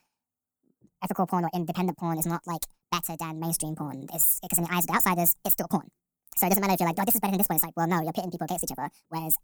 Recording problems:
wrong speed and pitch; too fast and too high; 1.7 times normal speed

